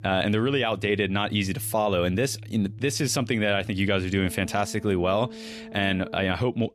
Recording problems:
background music; noticeable; throughout; 15 dB below the speech

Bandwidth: 14.5 kHz